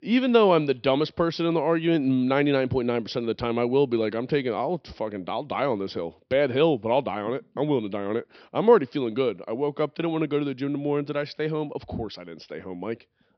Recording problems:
high frequencies cut off; noticeable; nothing above 5.5 kHz

